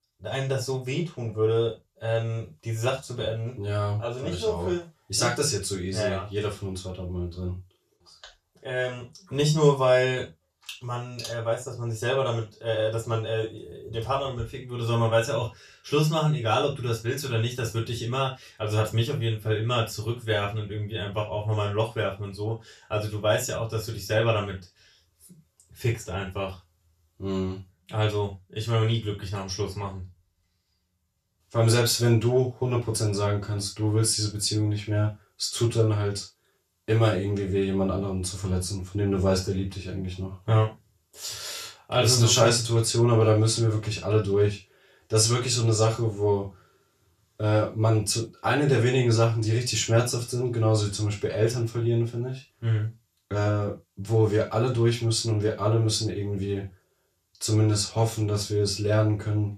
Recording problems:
off-mic speech; far
room echo; slight; dies away in 0.2 s

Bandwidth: 14 kHz